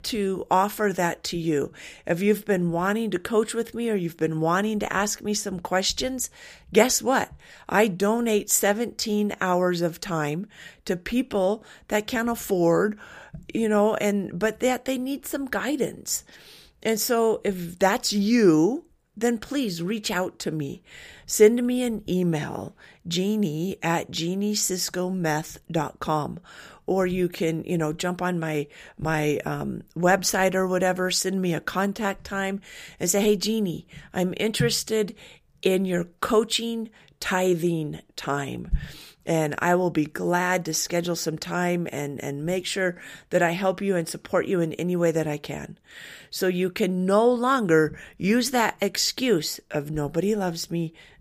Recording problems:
none

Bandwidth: 15 kHz